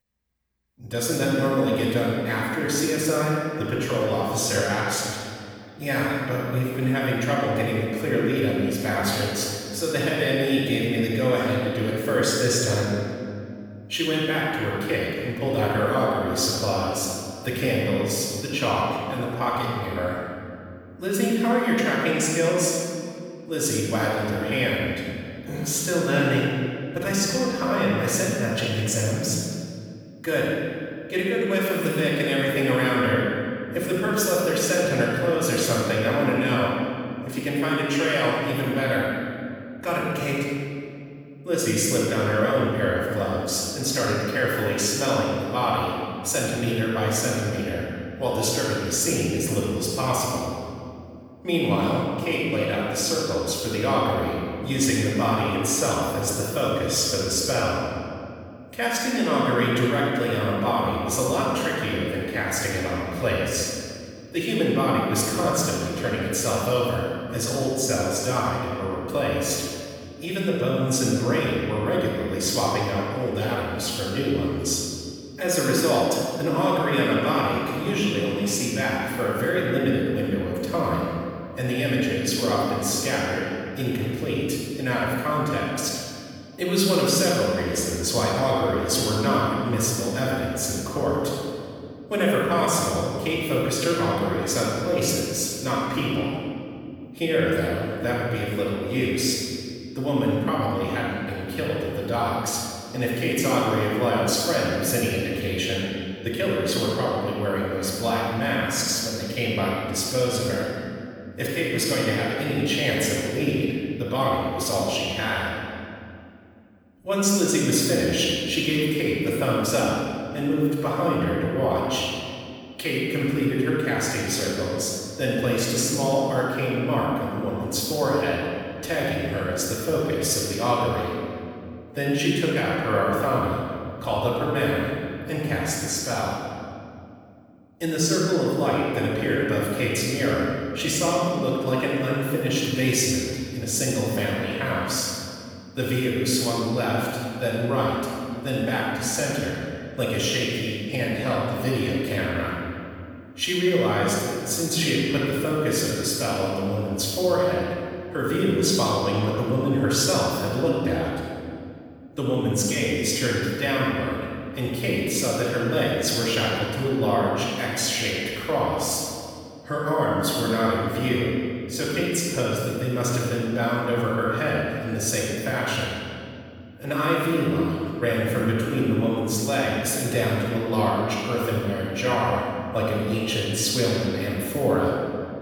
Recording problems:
room echo; strong; dies away in 2.3 s
off-mic speech; far

